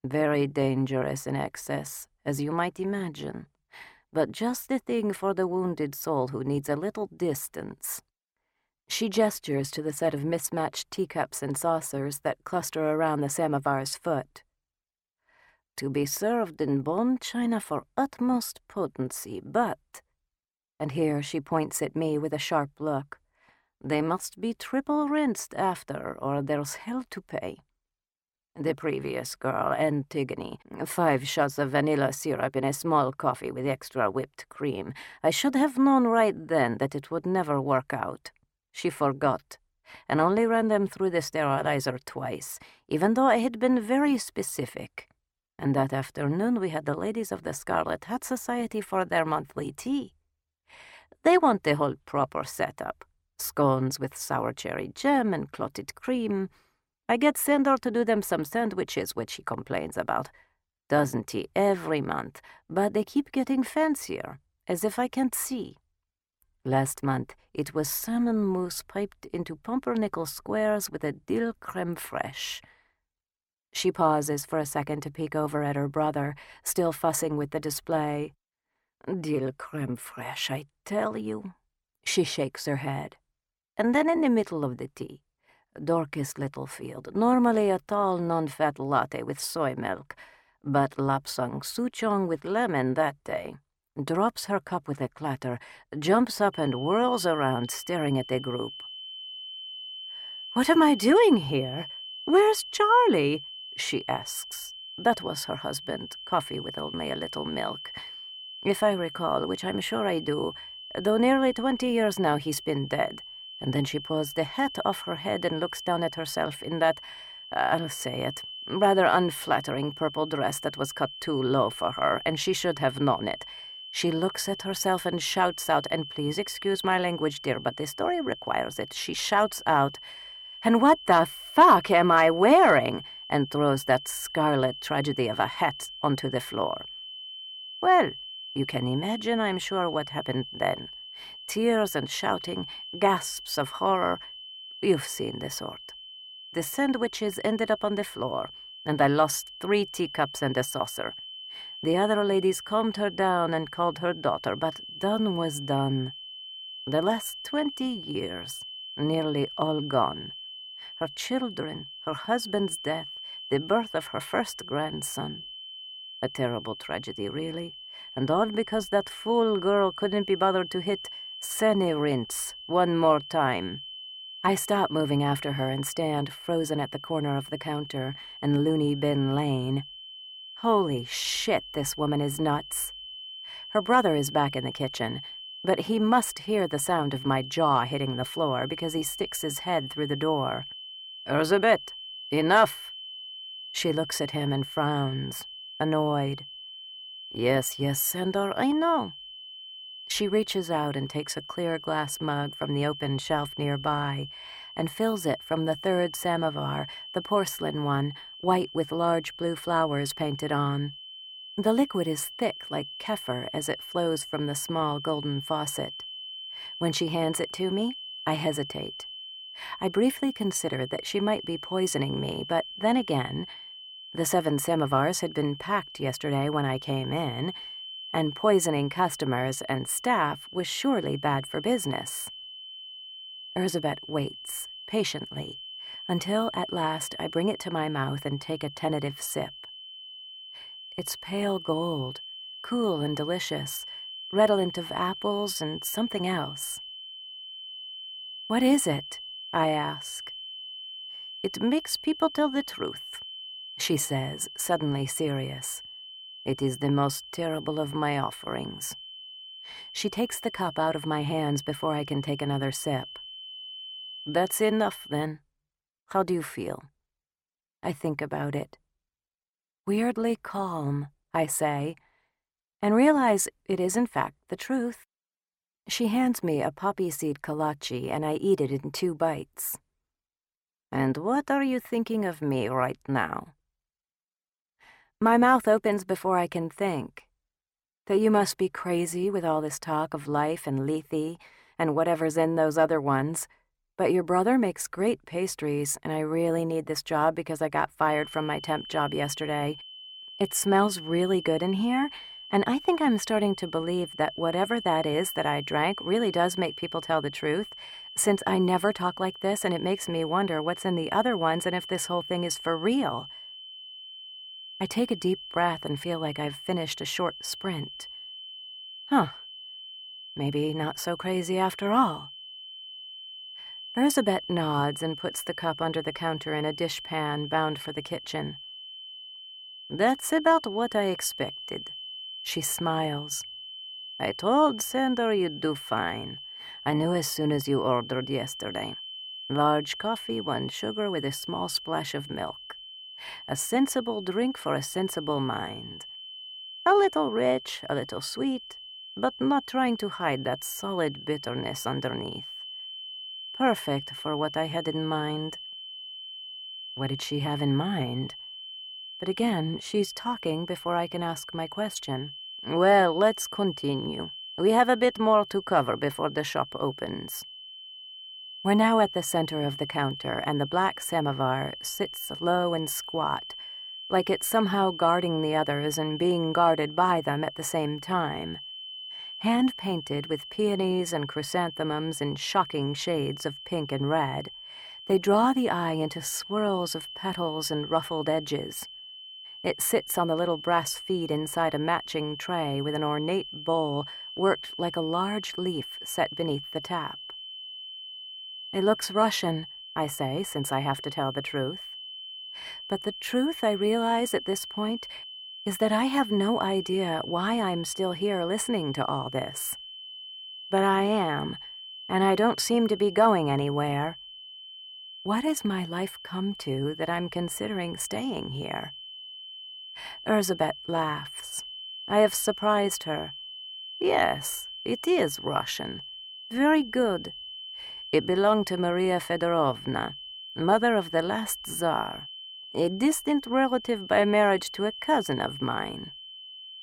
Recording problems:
high-pitched whine; noticeable; from 1:37 to 4:25 and from 4:58 on; 3 kHz, 10 dB below the speech

